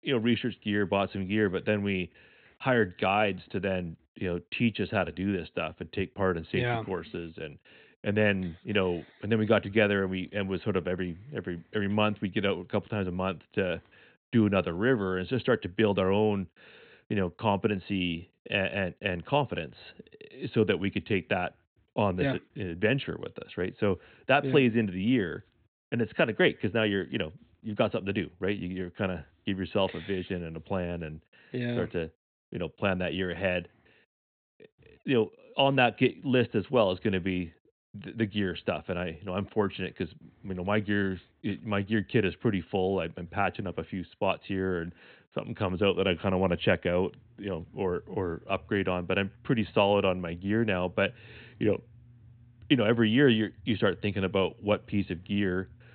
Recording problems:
high frequencies cut off; severe; nothing above 4 kHz

